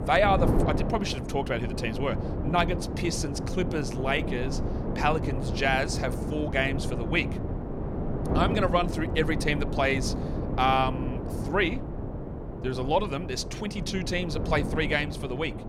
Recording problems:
wind noise on the microphone; heavy; 9 dB below the speech

